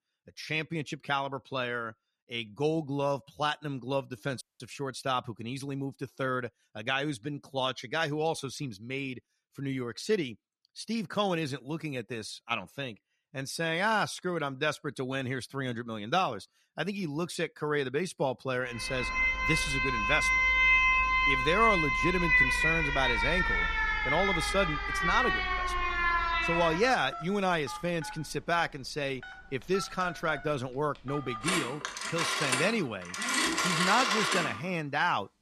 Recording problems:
alarms or sirens; very loud; from 19 s on; 5 dB above the speech
audio cutting out; at 4.5 s

